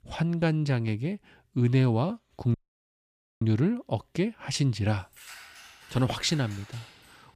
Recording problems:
audio cutting out; at 2.5 s for 1 s
jangling keys; faint; from 5 s on; peak 15 dB below the speech

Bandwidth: 14.5 kHz